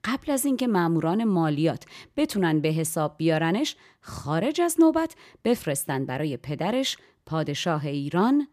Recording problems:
none

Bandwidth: 14.5 kHz